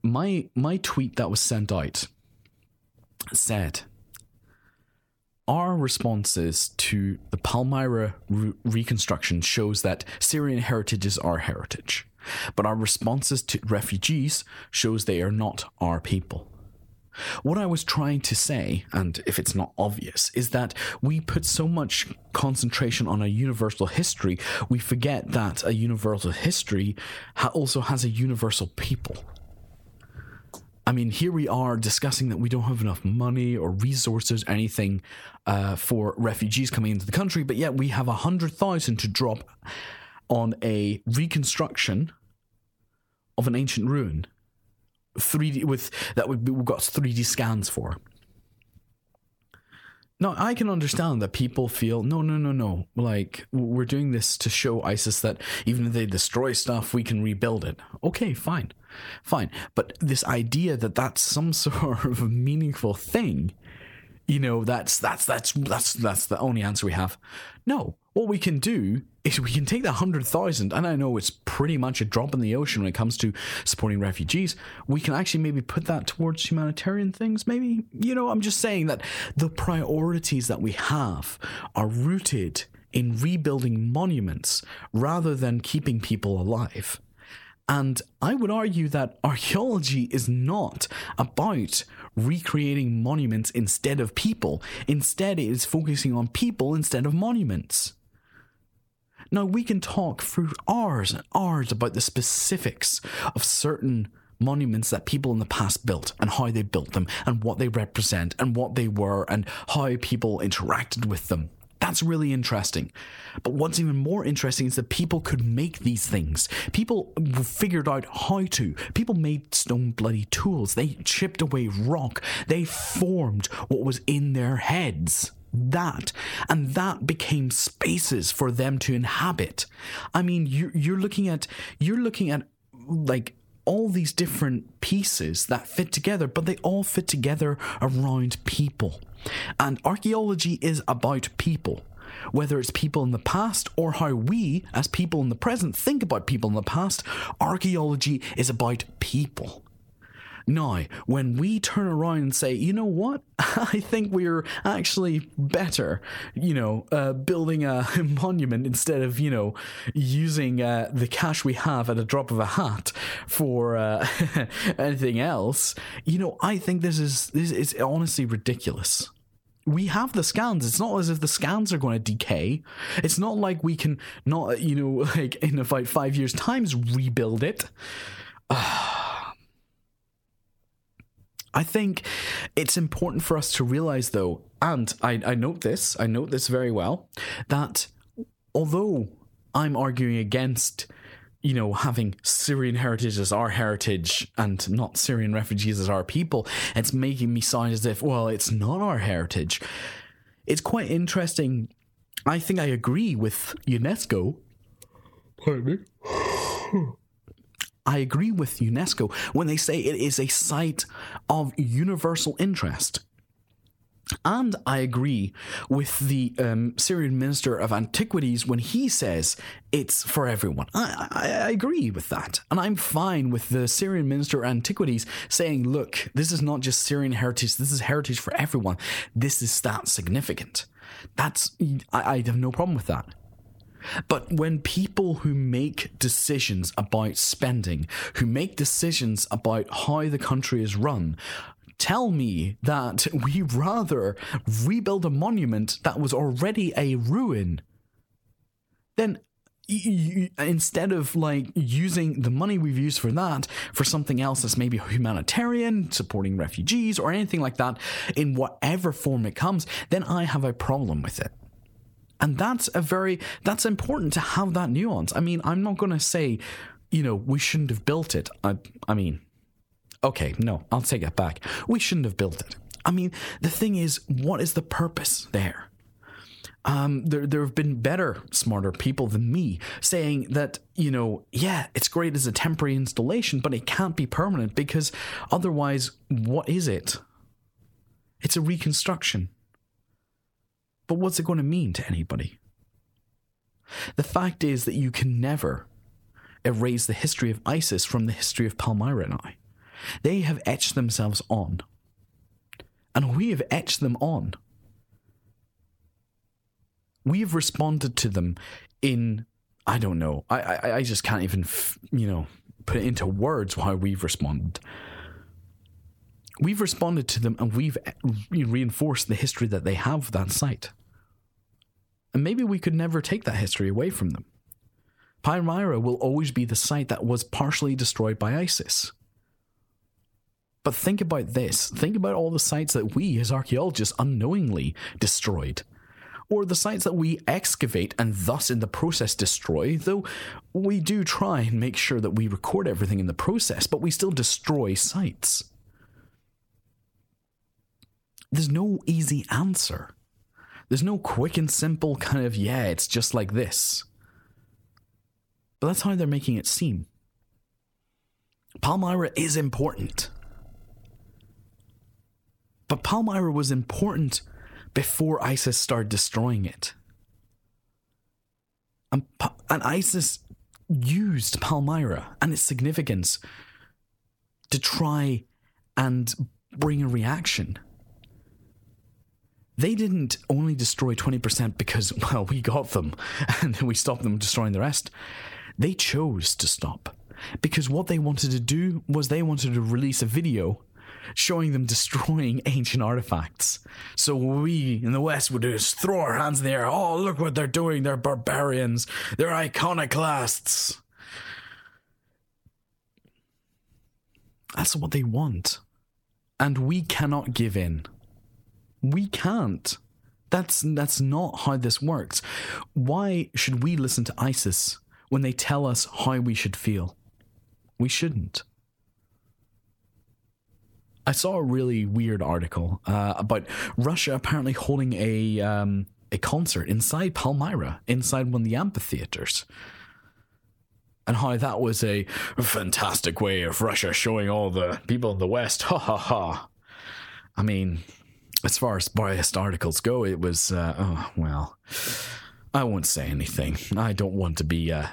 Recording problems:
squashed, flat; somewhat

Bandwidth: 17.5 kHz